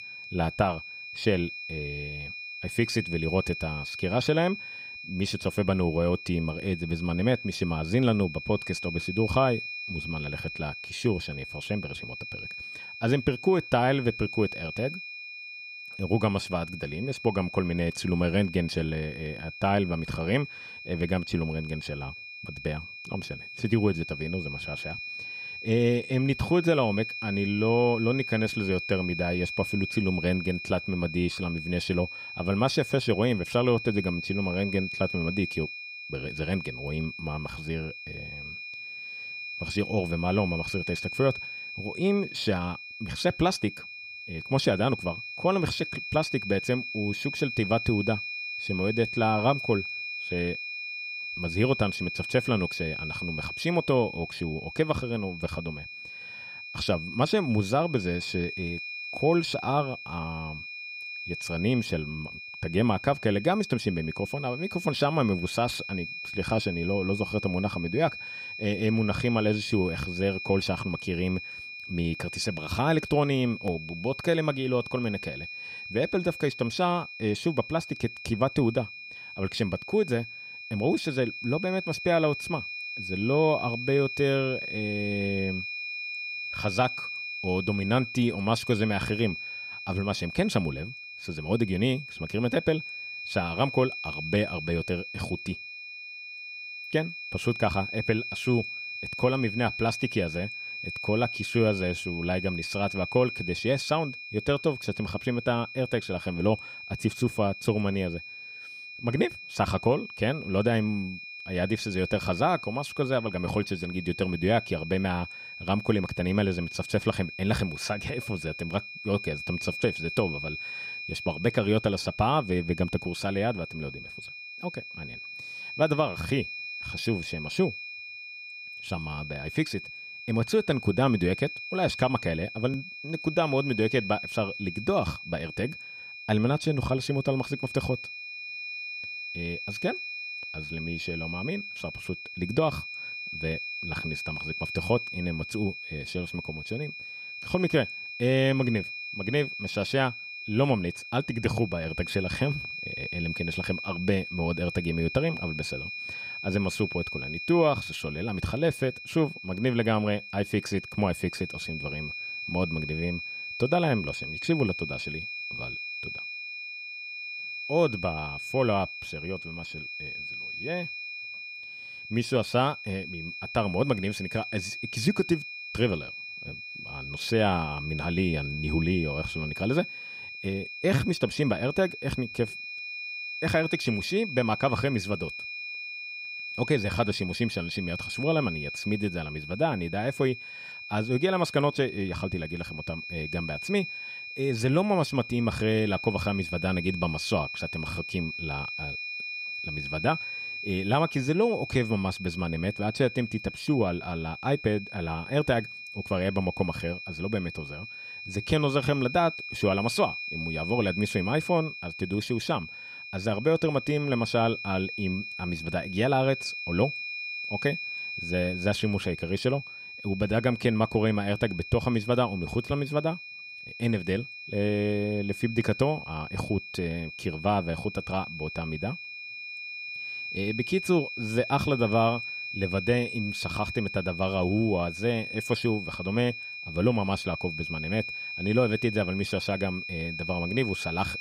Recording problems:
high-pitched whine; loud; throughout; 2.5 kHz, 7 dB below the speech

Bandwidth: 15.5 kHz